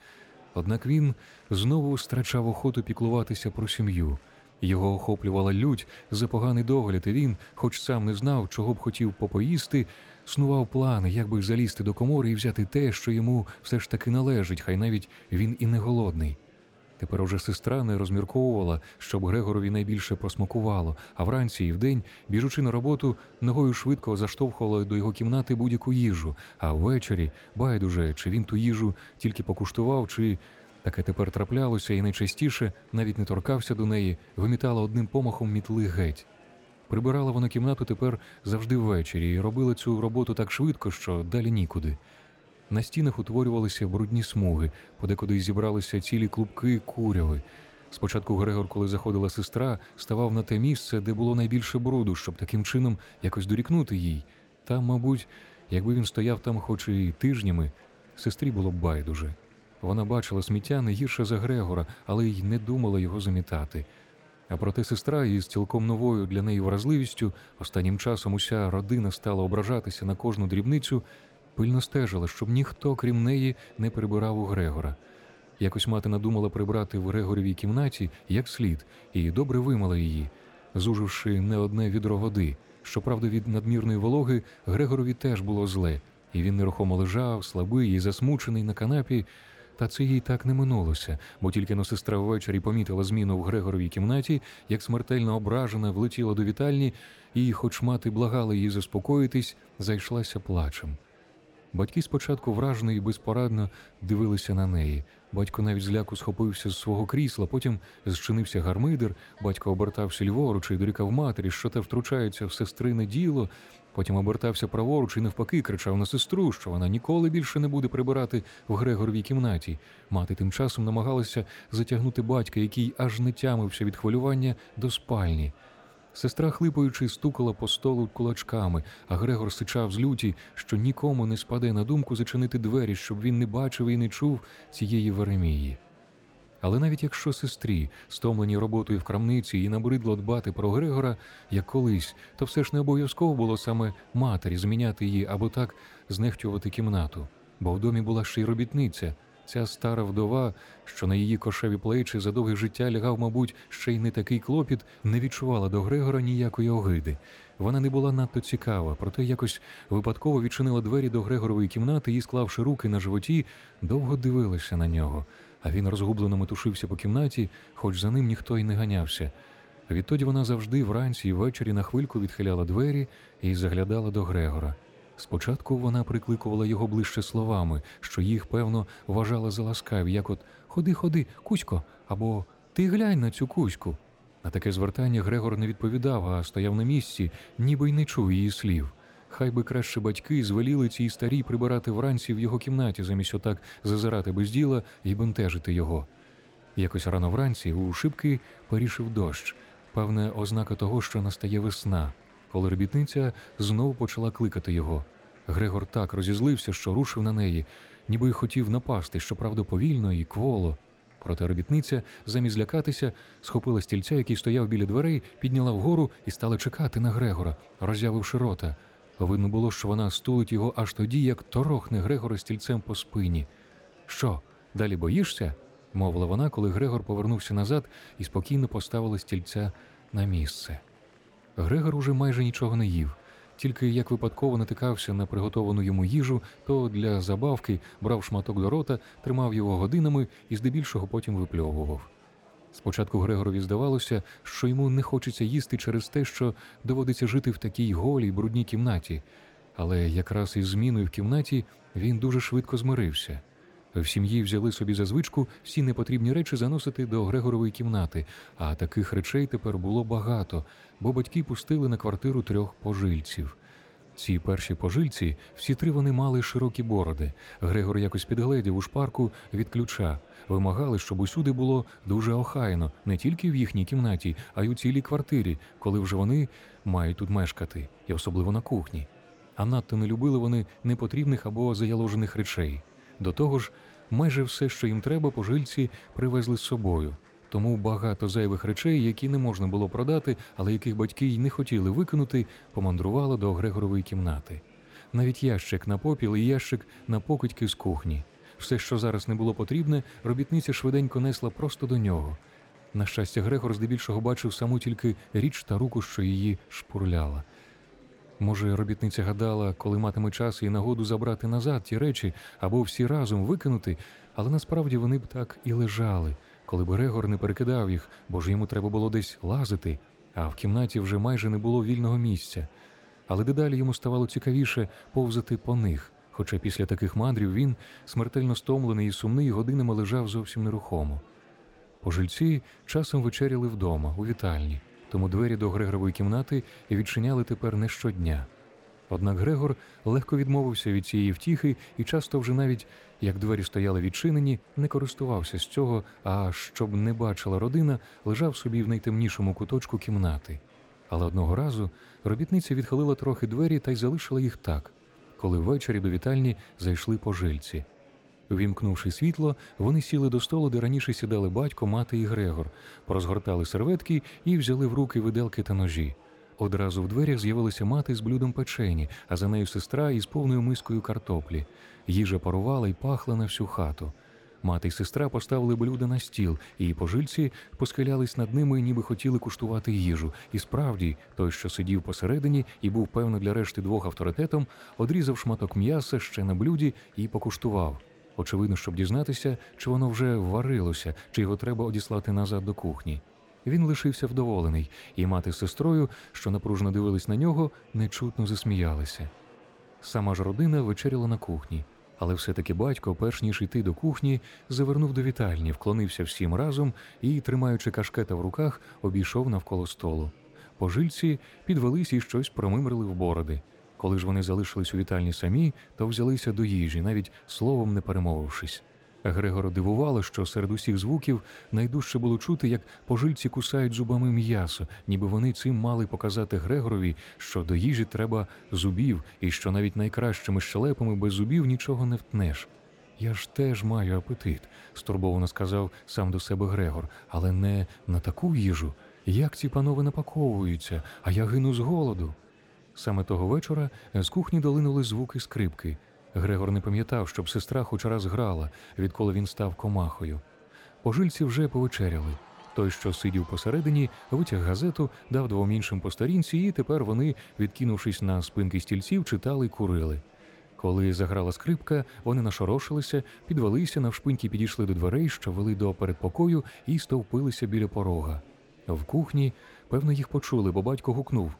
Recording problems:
murmuring crowd; faint; throughout; 30 dB below the speech

